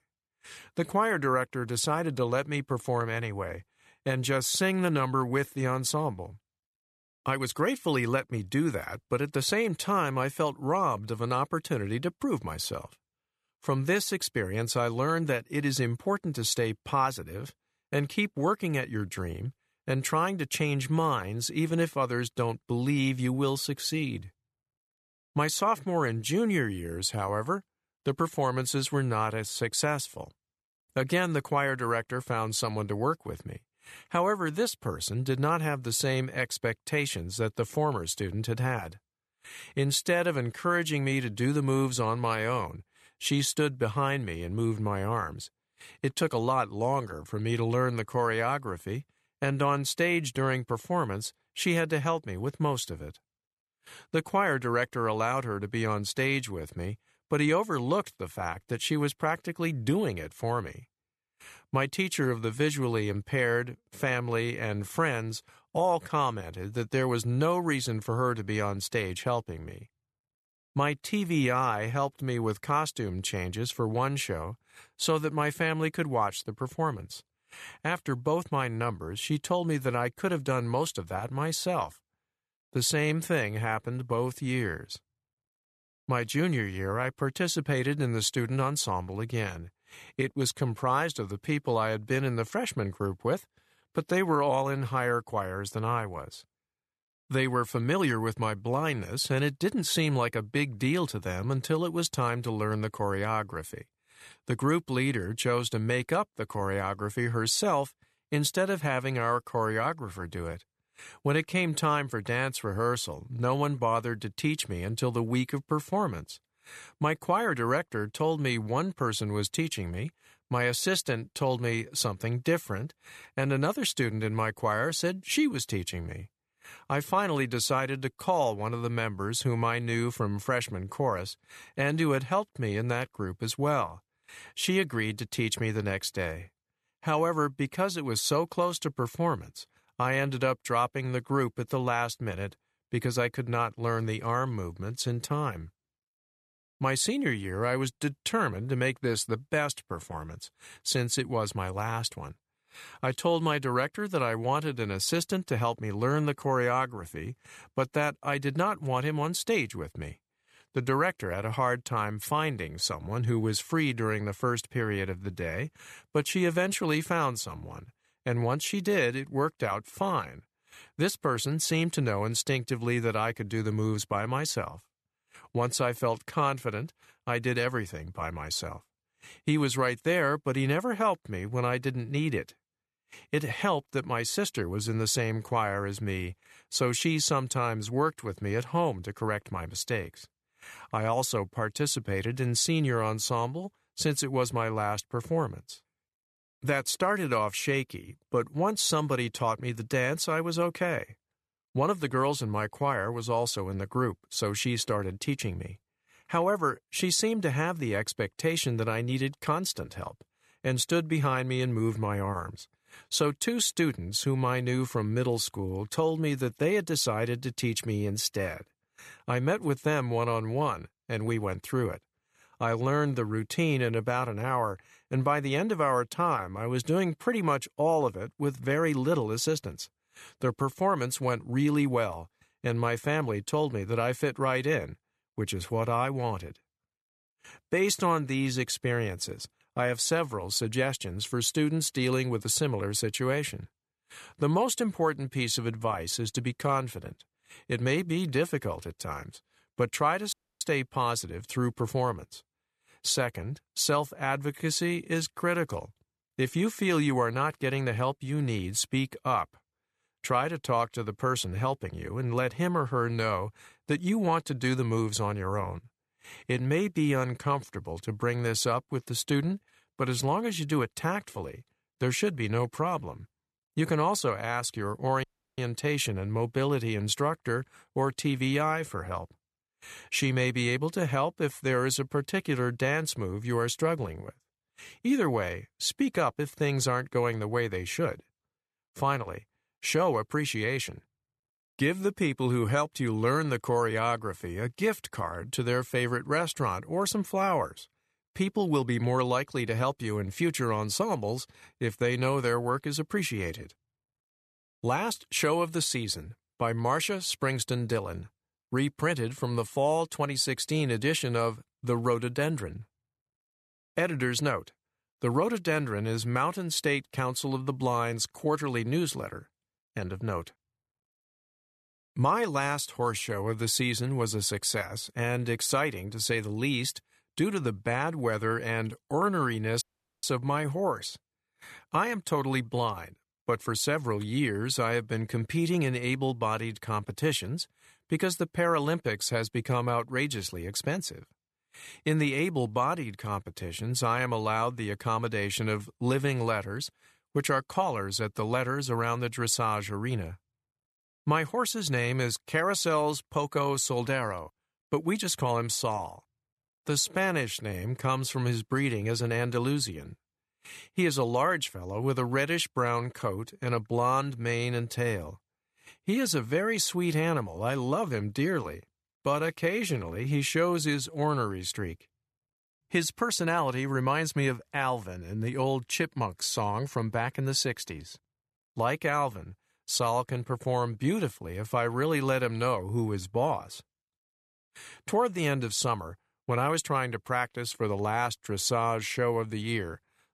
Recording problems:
audio cutting out; at 4:10, at 4:35 and at 5:30

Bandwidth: 13.5 kHz